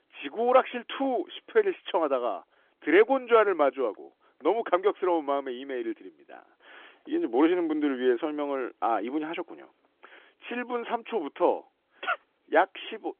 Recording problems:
phone-call audio; nothing above 3.5 kHz

